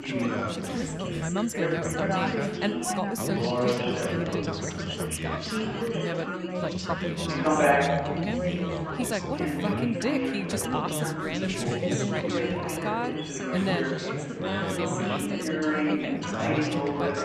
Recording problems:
chatter from many people; very loud; throughout; 5 dB above the speech

